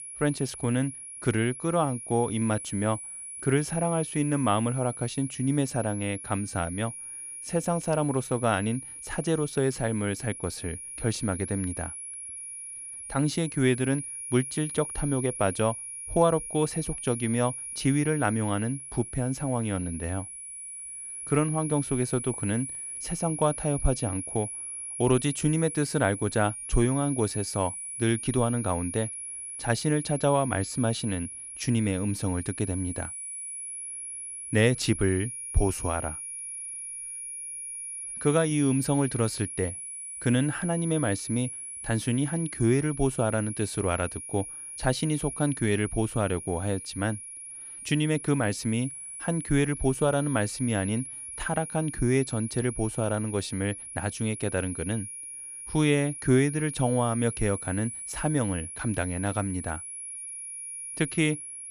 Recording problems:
high-pitched whine; loud; throughout; 10.5 kHz, 8 dB below the speech

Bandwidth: 14.5 kHz